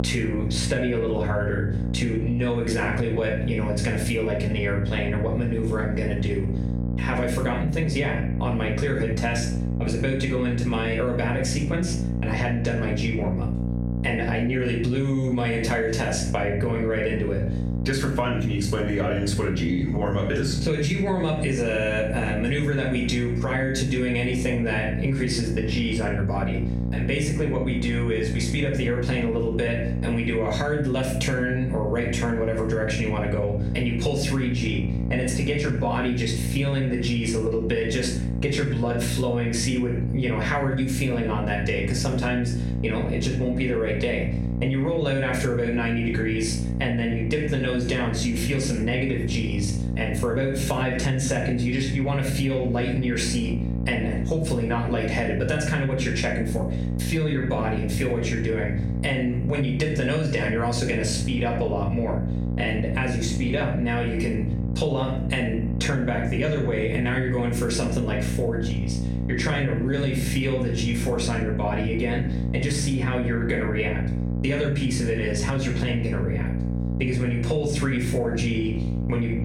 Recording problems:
off-mic speech; far
room echo; noticeable; dies away in 0.5 s
squashed, flat; somewhat
electrical hum; noticeable; throughout; 60 Hz, 10 dB below the speech

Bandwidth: 16 kHz